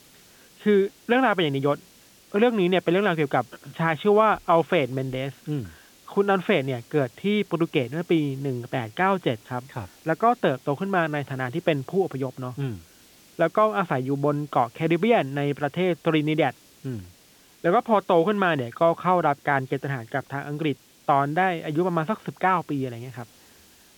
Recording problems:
high frequencies cut off; severe; nothing above 4 kHz
hiss; faint; throughout; 30 dB below the speech

